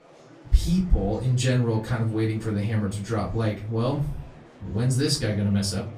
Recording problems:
off-mic speech; far
room echo; very slight; dies away in 0.3 s
murmuring crowd; faint; throughout; 25 dB below the speech

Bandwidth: 15 kHz